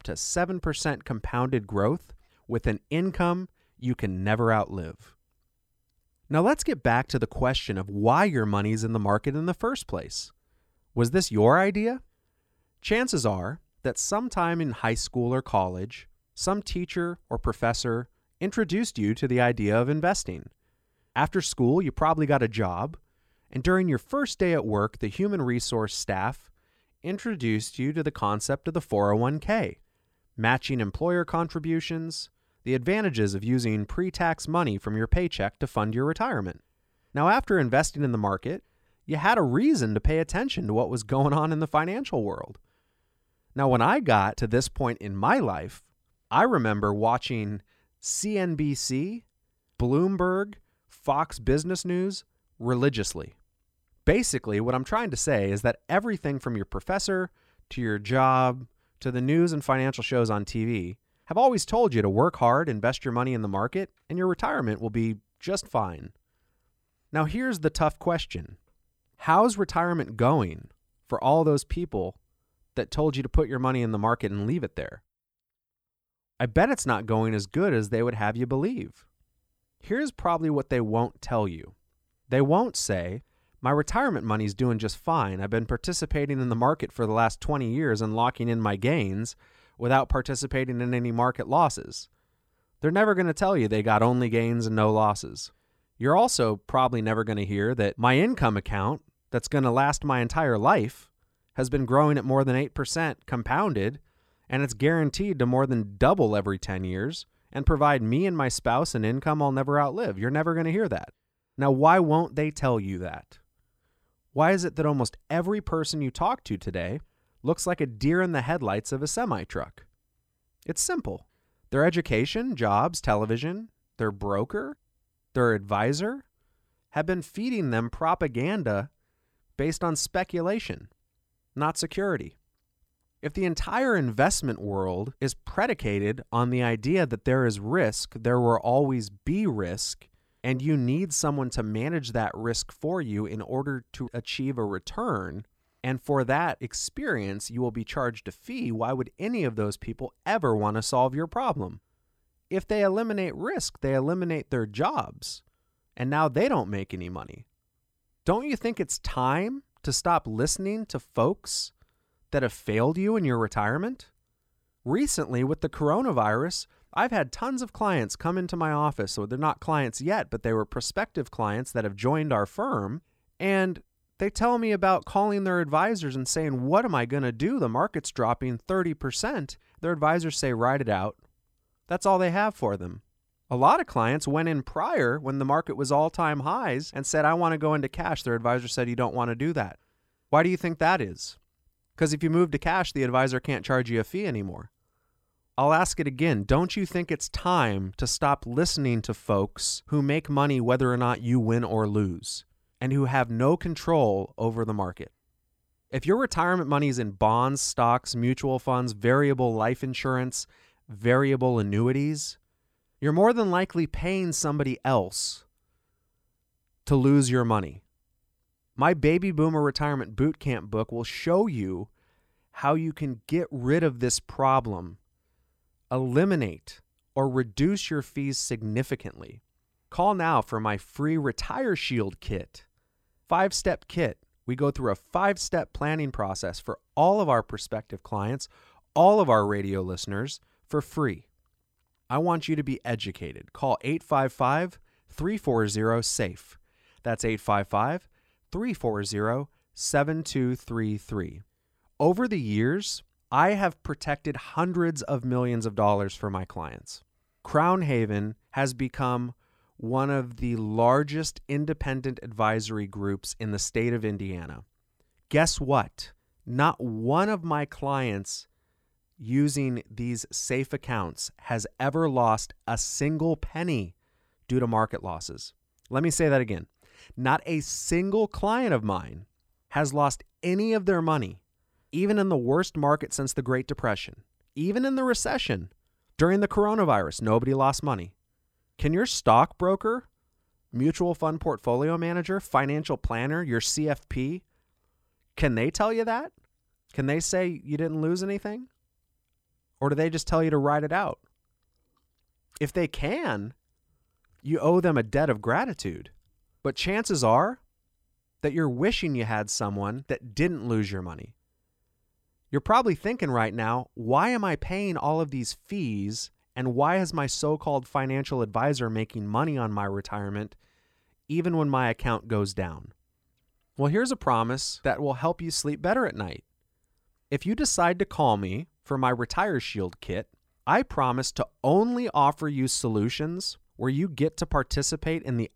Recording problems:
uneven, jittery; strongly; from 27 s to 4:21

